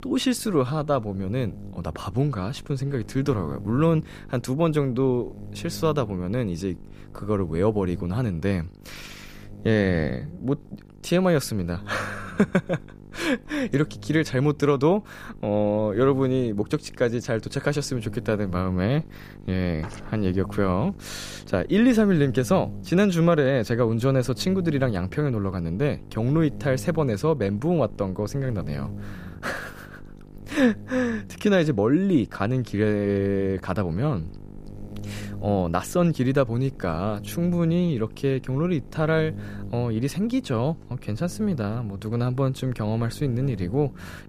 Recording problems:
electrical hum; faint; throughout; 50 Hz, 20 dB below the speech

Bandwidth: 14.5 kHz